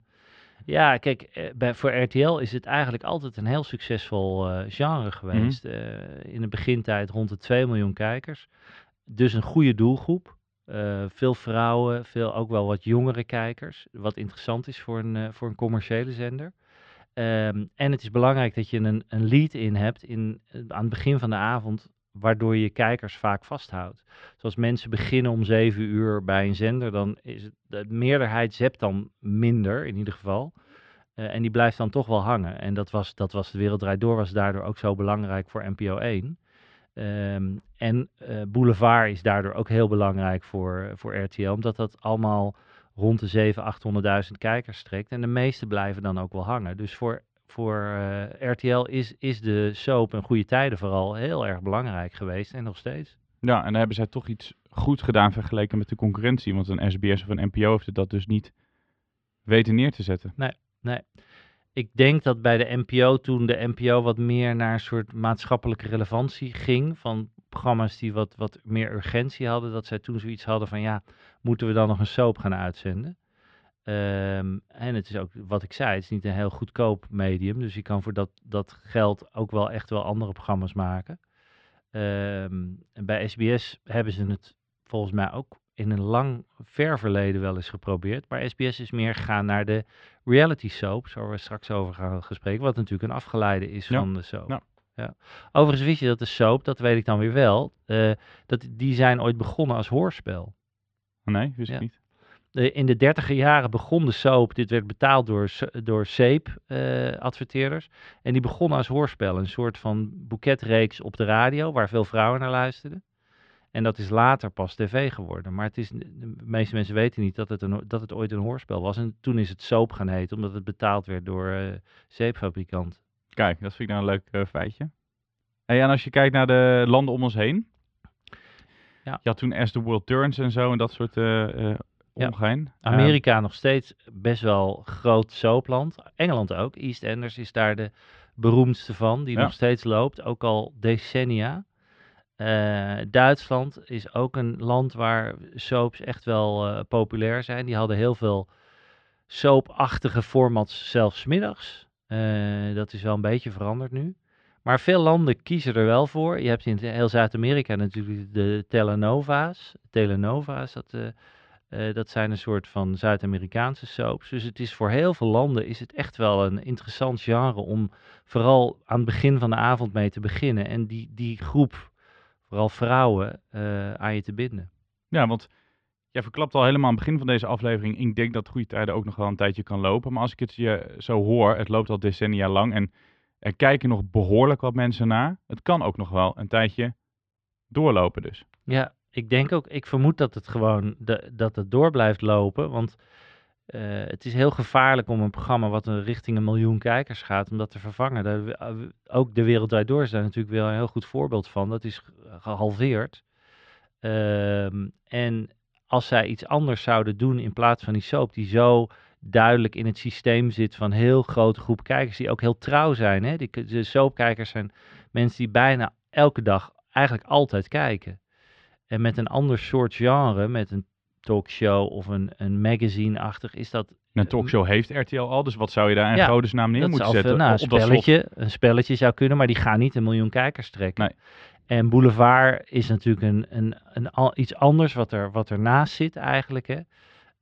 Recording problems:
muffled; slightly; fading above 3.5 kHz

